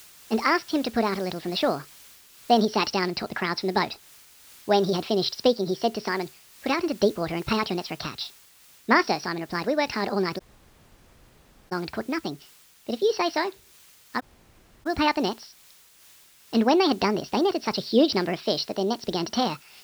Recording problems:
wrong speed and pitch; too fast and too high; 1.5 times normal speed
high frequencies cut off; noticeable; nothing above 6 kHz
hiss; faint; throughout; 25 dB below the speech
audio cutting out; at 10 s for 1.5 s and at 14 s for 0.5 s

